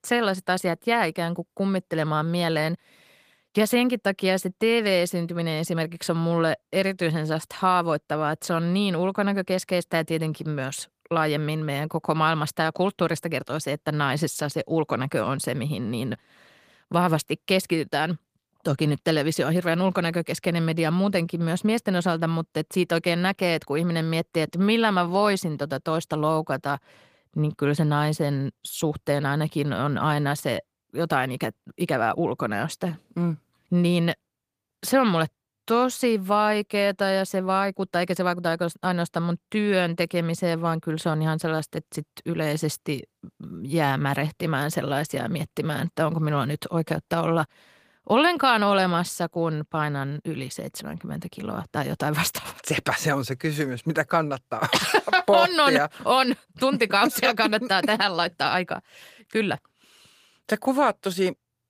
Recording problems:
garbled, watery; slightly; nothing above 15 kHz

